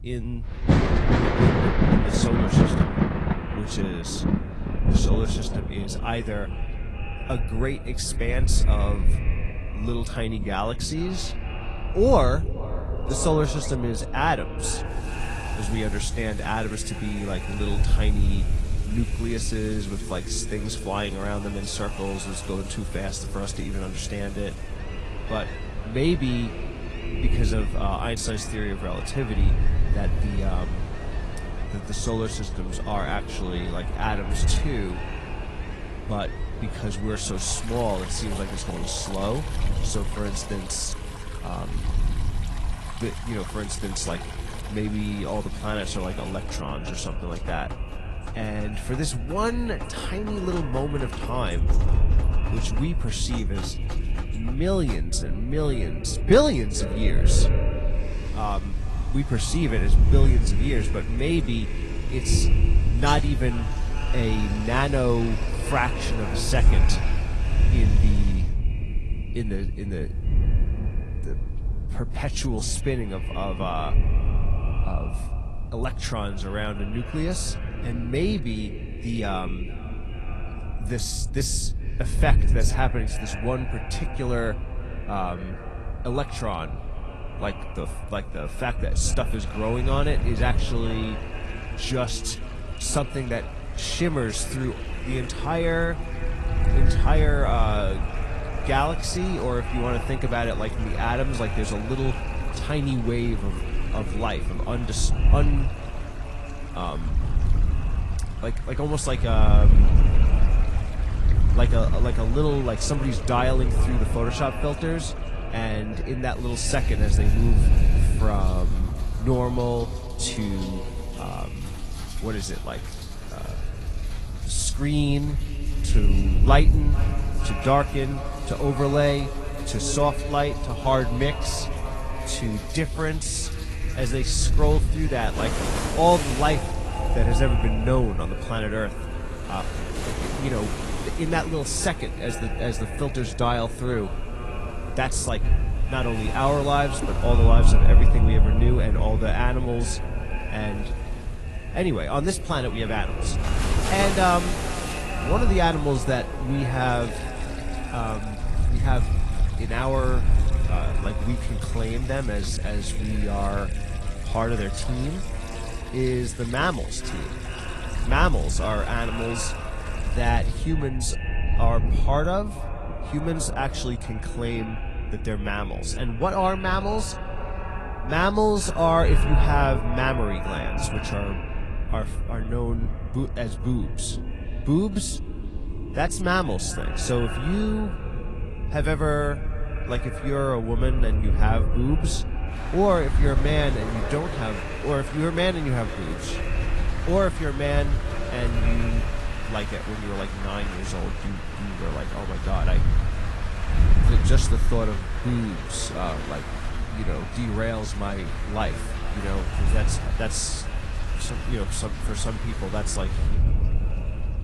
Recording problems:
echo of what is said; strong; throughout; 440 ms later, 10 dB below the speech
garbled, watery; slightly
rain or running water; loud; throughout; 8 dB below the speech
wind noise on the microphone; occasional gusts; 15 dB below the speech

